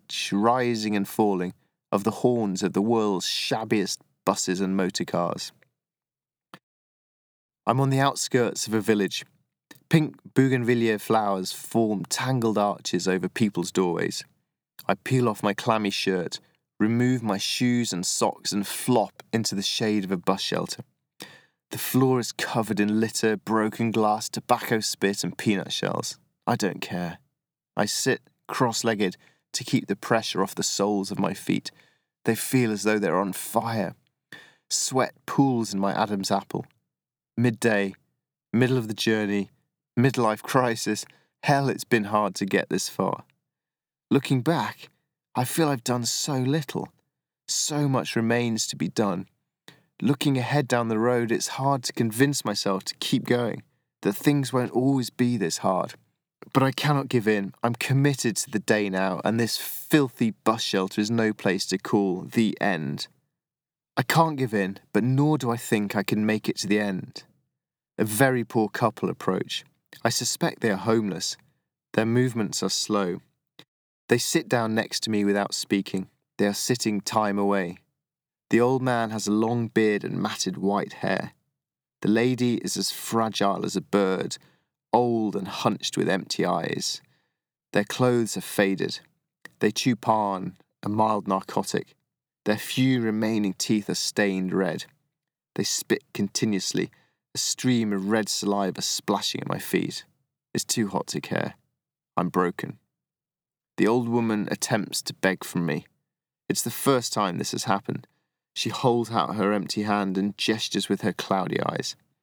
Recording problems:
none

